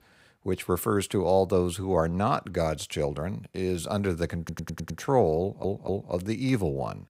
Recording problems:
audio stuttering; at 4.5 s and at 5.5 s

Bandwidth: 15.5 kHz